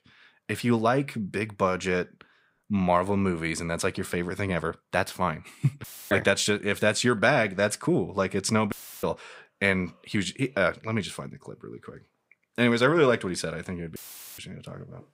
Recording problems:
audio cutting out; filled with static; at 6 s, at 8.5 s and at 14 s

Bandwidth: 15.5 kHz